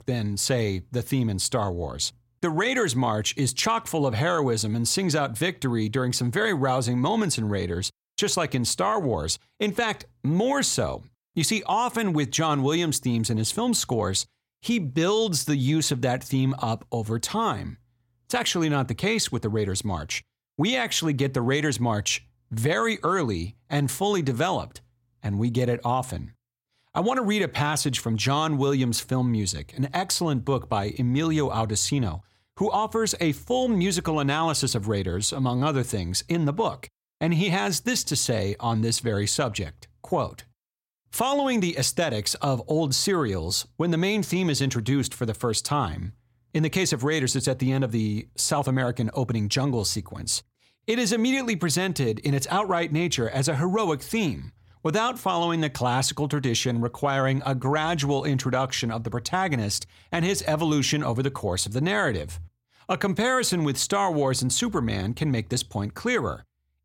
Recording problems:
none

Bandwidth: 16.5 kHz